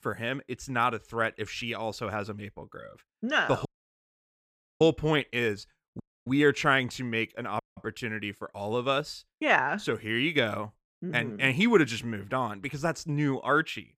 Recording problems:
audio cutting out; at 3.5 s for 1 s, at 6 s and at 7.5 s

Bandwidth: 15 kHz